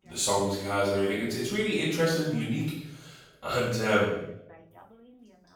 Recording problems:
off-mic speech; far
room echo; noticeable; dies away in 0.7 s
voice in the background; faint; throughout; 25 dB below the speech

